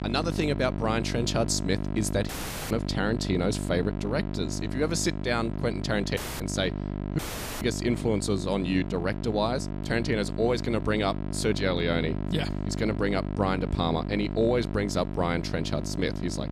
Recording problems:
electrical hum; loud; throughout; 50 Hz, 10 dB below the speech
audio cutting out; at 2.5 s, at 6 s and at 7 s

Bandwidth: 14.5 kHz